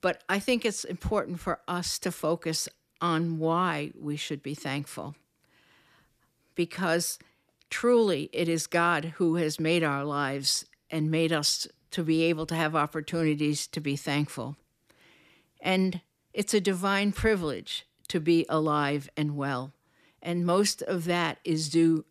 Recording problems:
none

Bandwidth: 14.5 kHz